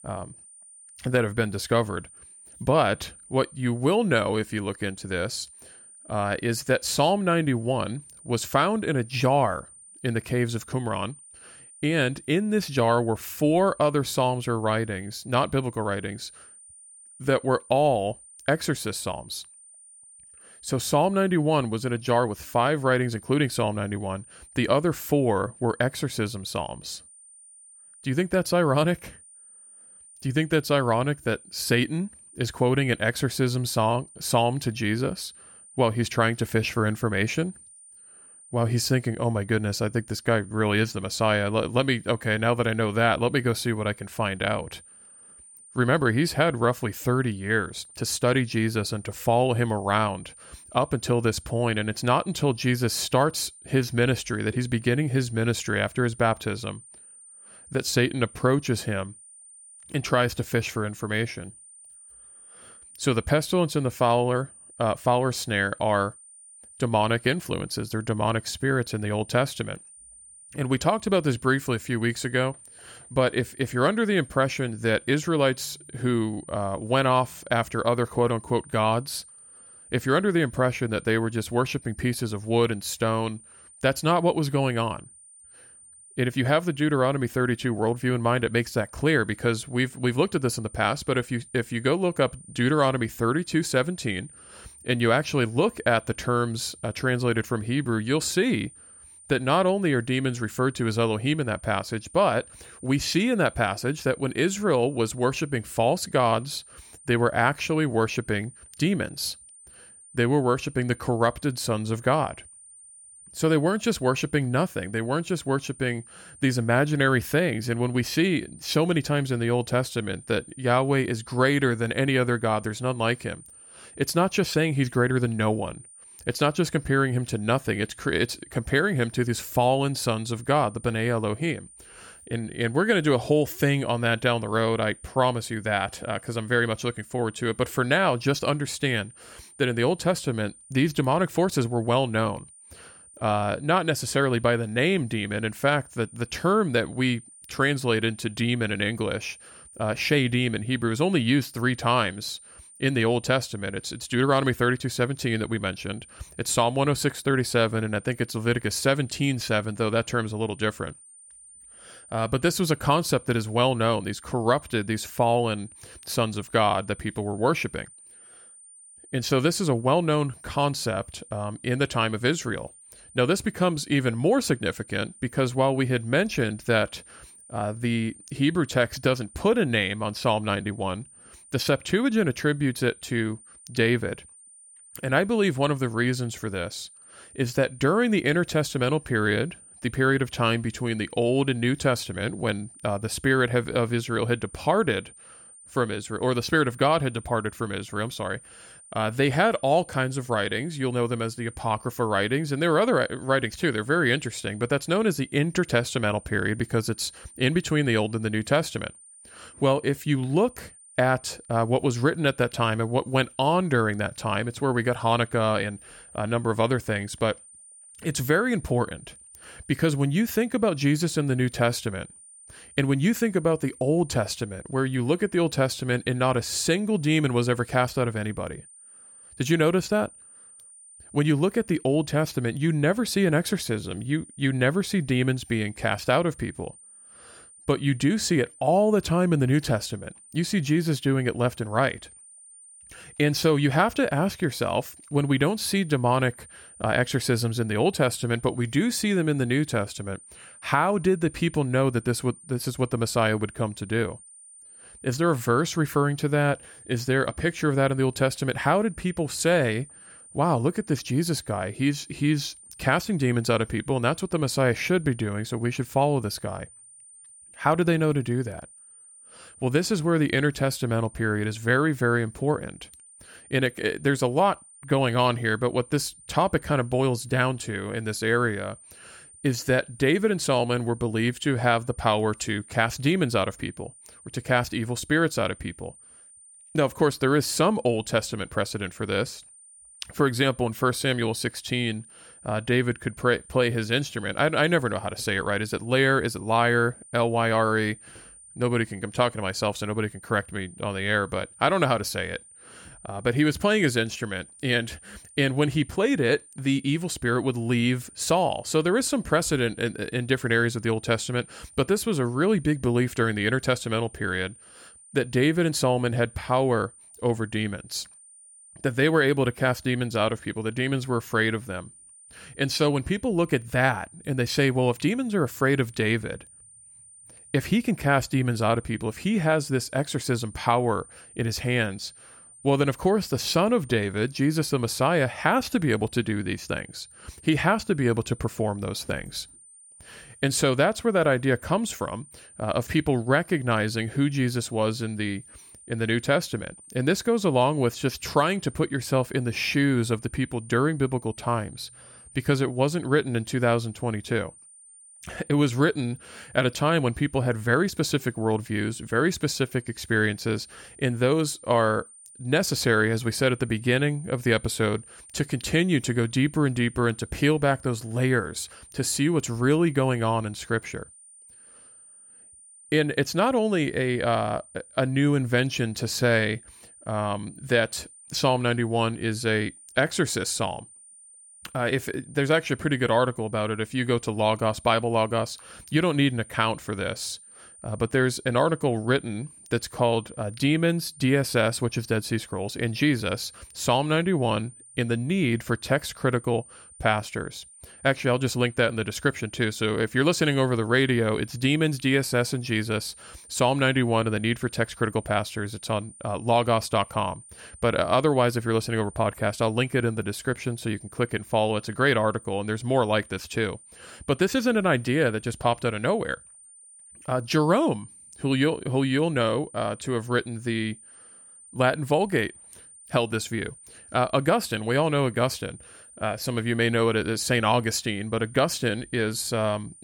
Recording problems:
high-pitched whine; faint; throughout; 9 kHz, 20 dB below the speech

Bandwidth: 17.5 kHz